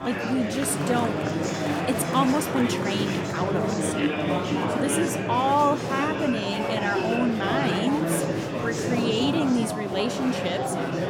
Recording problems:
murmuring crowd; loud; throughout; as loud as the speech

